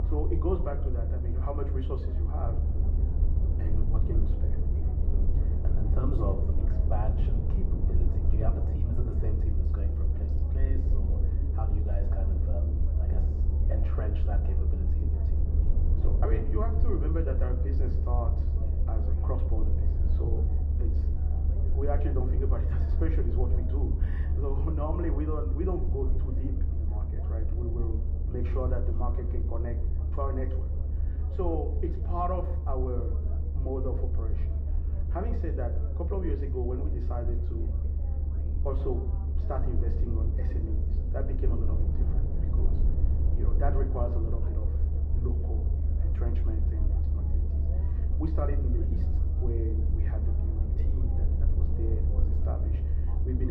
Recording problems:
muffled; very; fading above 2 kHz
room echo; very slight; dies away in 0.6 s
off-mic speech; somewhat distant
low rumble; loud; throughout; 6 dB below the speech
background chatter; noticeable; throughout; 2 voices, 15 dB below the speech
abrupt cut into speech; at the end

